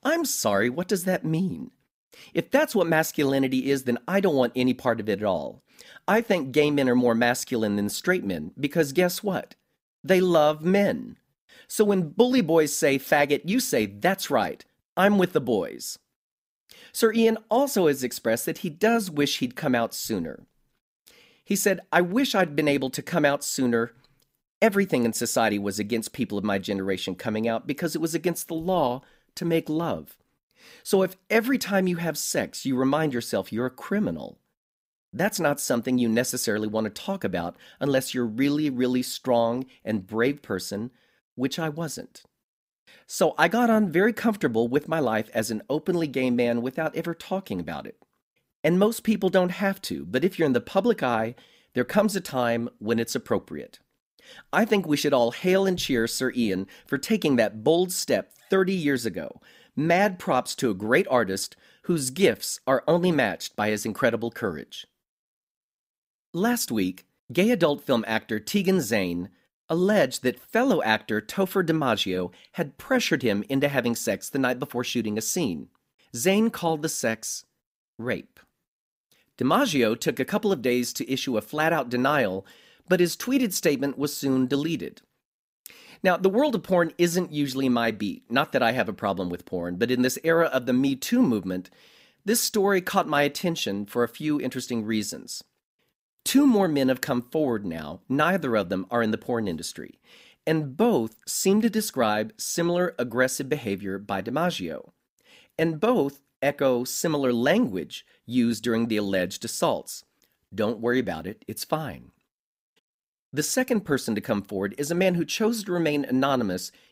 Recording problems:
none

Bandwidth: 15.5 kHz